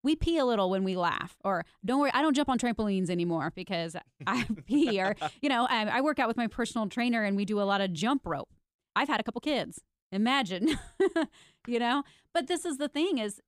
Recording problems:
uneven, jittery; strongly; from 2 to 13 s

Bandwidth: 15 kHz